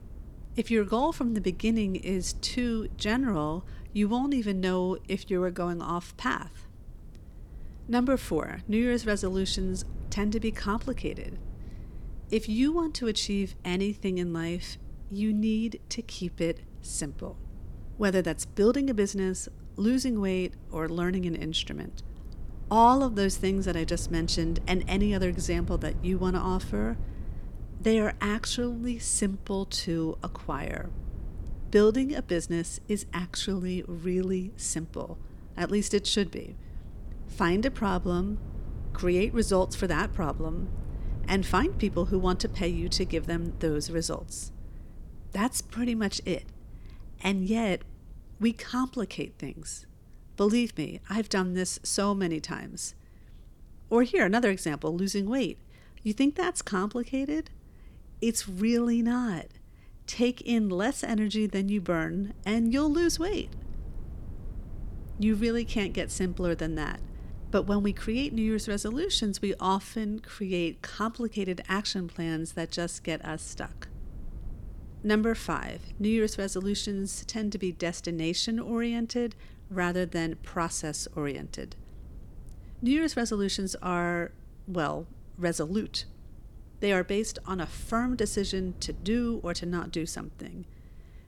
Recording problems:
low rumble; faint; throughout; 25 dB below the speech

